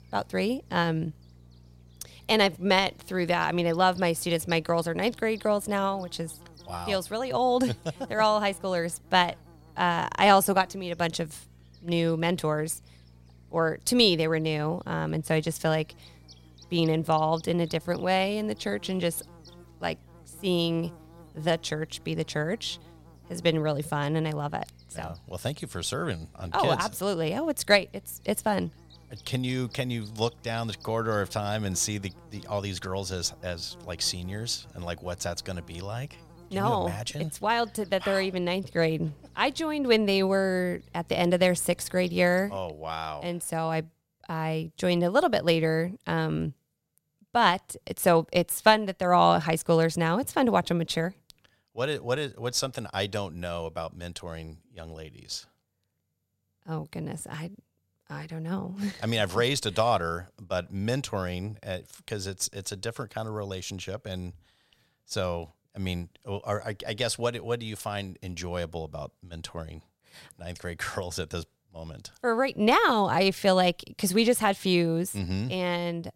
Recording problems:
electrical hum; faint; until 43 s; 60 Hz, 30 dB below the speech

